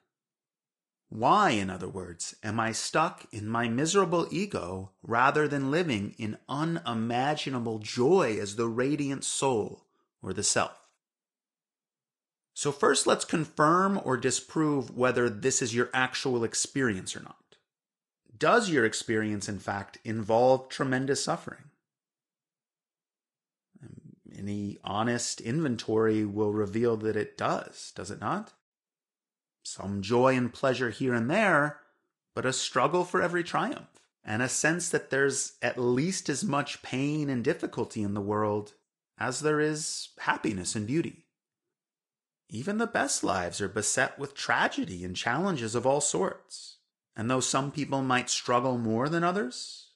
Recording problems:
garbled, watery; slightly

